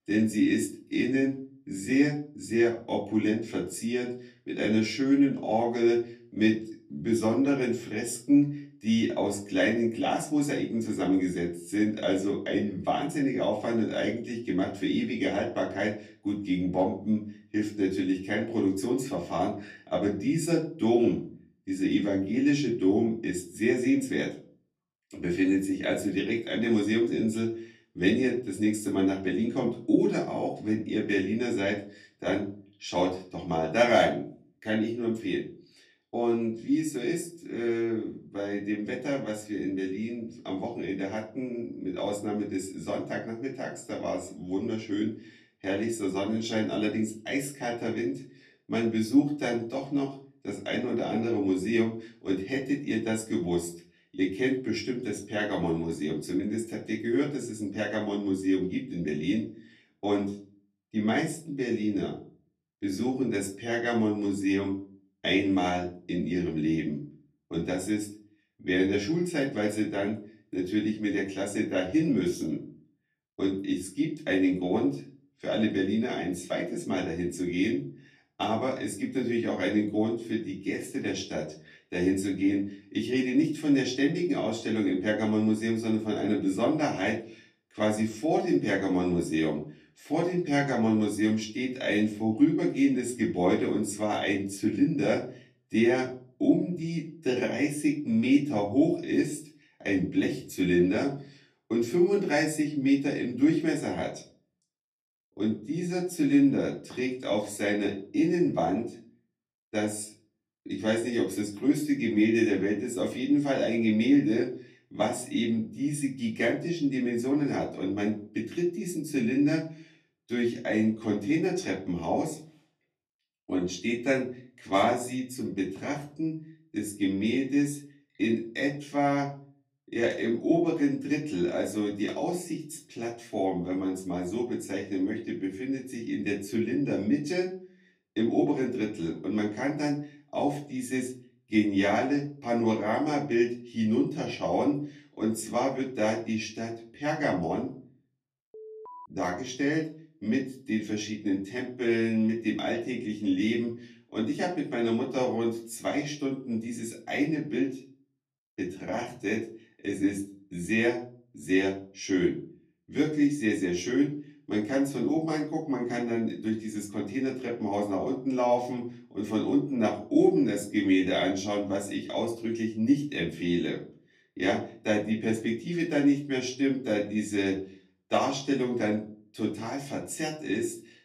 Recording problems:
off-mic speech; far
room echo; slight; dies away in 0.4 s
alarm; faint; at 2:29; peak 15 dB below the speech

